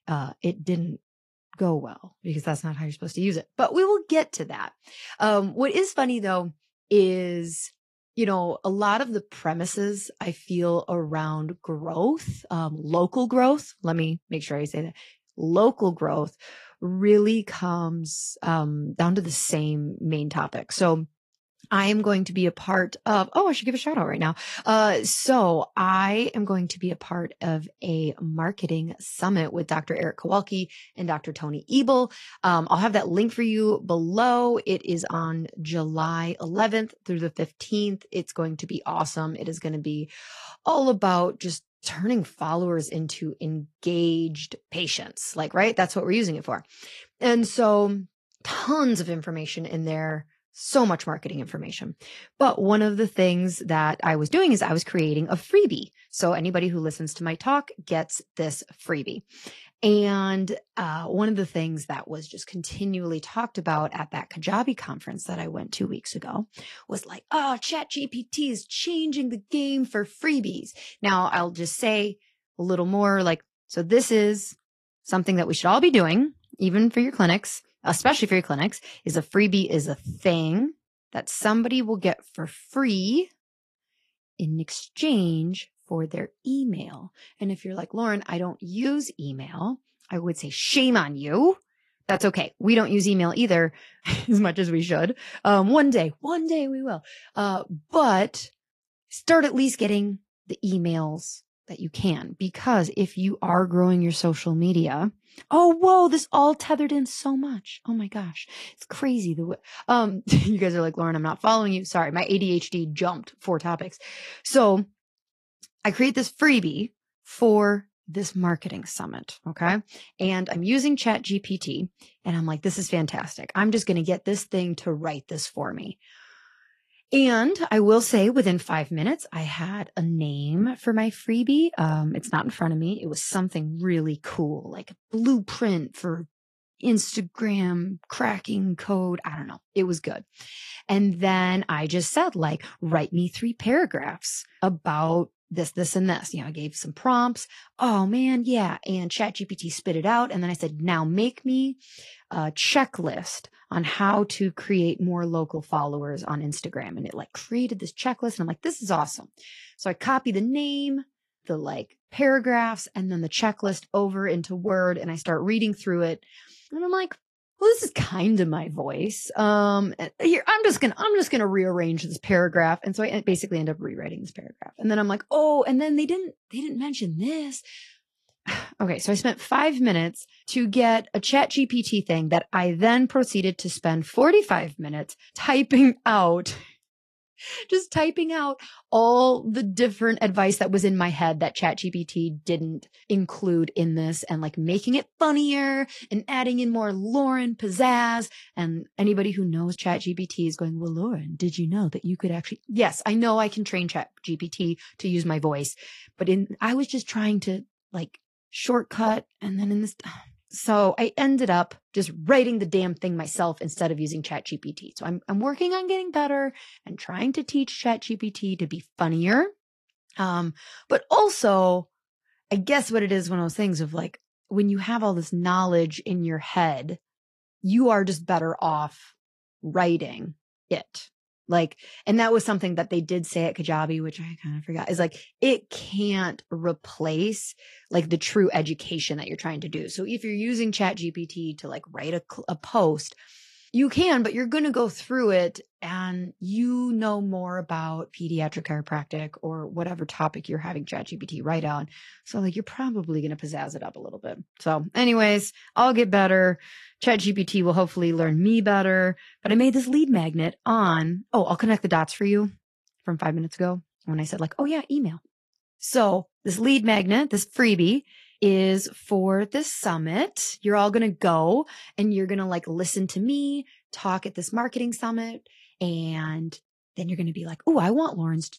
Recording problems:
garbled, watery; slightly; nothing above 14 kHz

